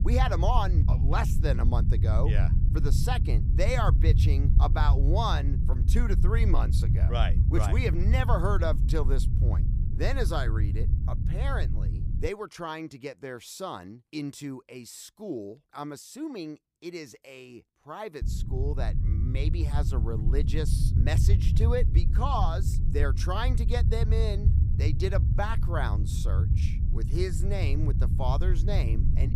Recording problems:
low rumble; loud; until 12 s and from 18 s on; 8 dB below the speech

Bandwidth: 15 kHz